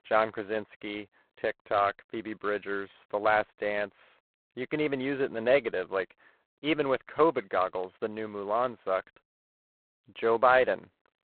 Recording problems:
phone-call audio; poor line; nothing above 4 kHz

